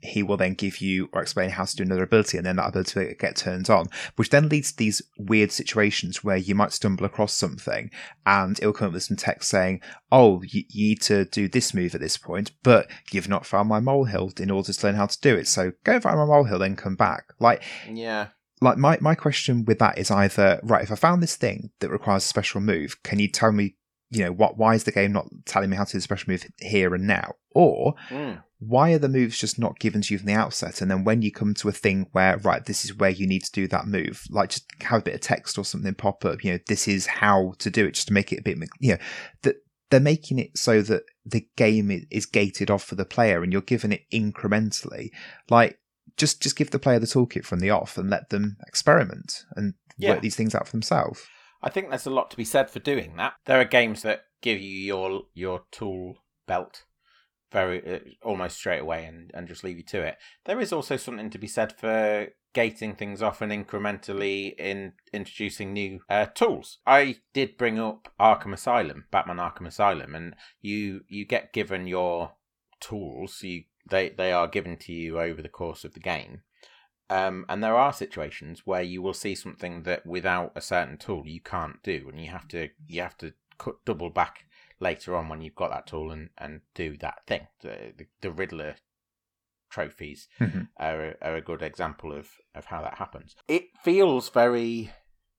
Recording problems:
none

